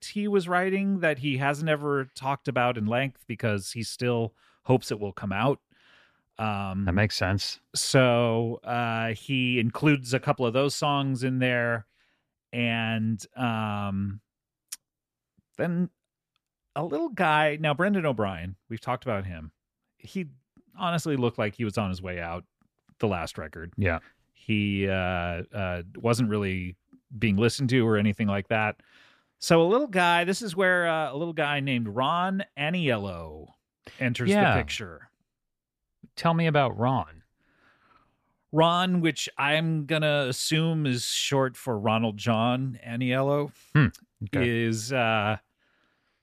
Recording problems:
none

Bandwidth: 14.5 kHz